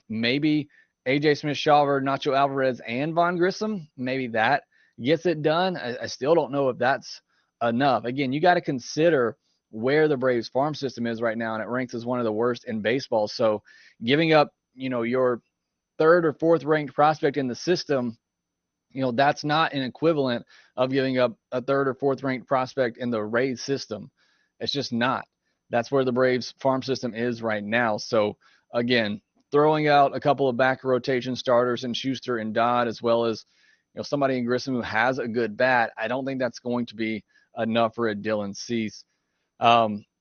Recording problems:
garbled, watery; slightly; nothing above 6.5 kHz

